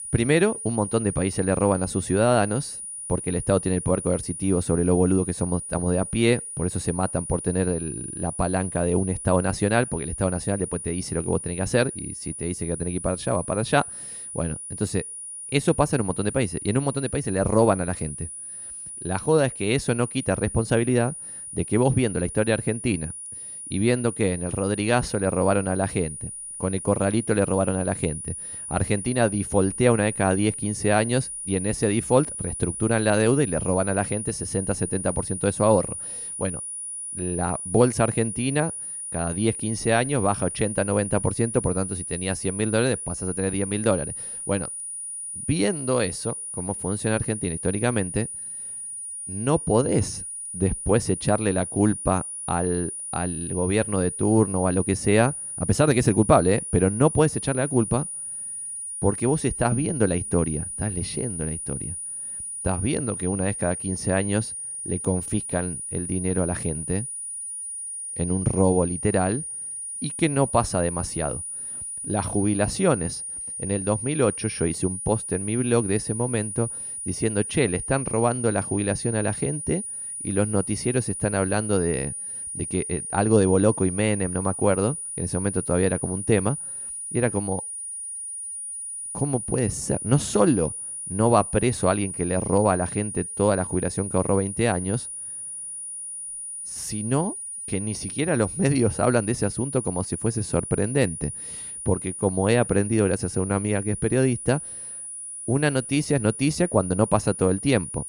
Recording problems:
high-pitched whine; loud; throughout; 9.5 kHz, 7 dB below the speech

